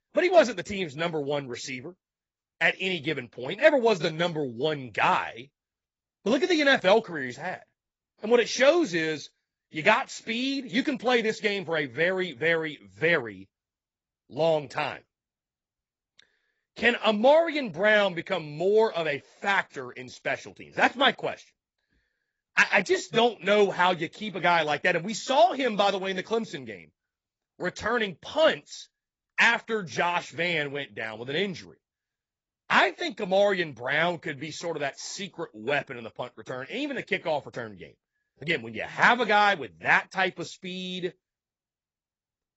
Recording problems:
garbled, watery; badly; nothing above 7.5 kHz

